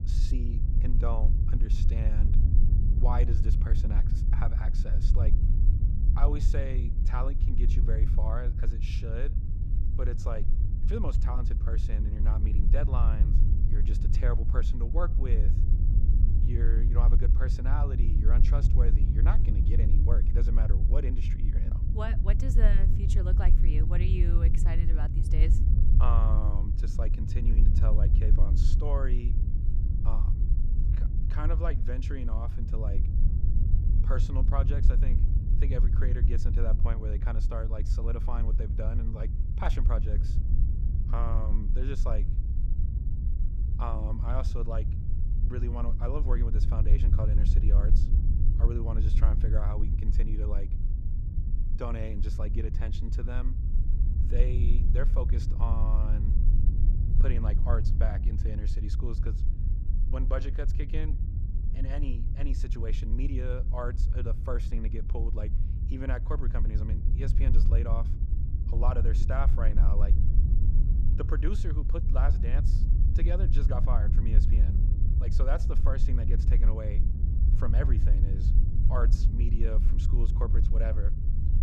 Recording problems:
low rumble; loud; throughout; 5 dB below the speech

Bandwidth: 15.5 kHz